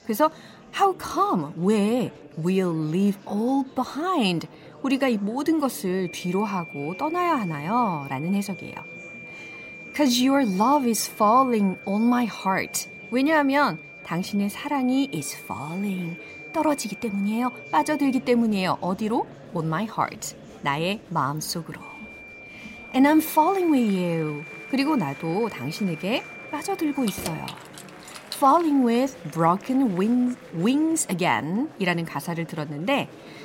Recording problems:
high-pitched whine; noticeable; from 6 to 18 s and from 22 to 27 s; 2.5 kHz, 15 dB below the speech
murmuring crowd; faint; throughout; 20 dB below the speech
jangling keys; noticeable; from 27 to 29 s; peak 10 dB below the speech

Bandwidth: 16 kHz